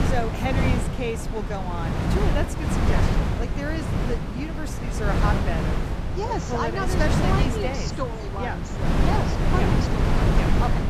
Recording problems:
wind noise on the microphone; heavy; as loud as the speech
background chatter; very faint; throughout; 4 voices, 30 dB below the speech

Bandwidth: 14.5 kHz